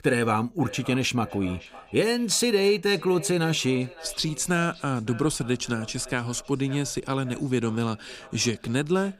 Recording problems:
echo of what is said; faint; throughout; 560 ms later, 20 dB below the speech

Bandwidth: 15.5 kHz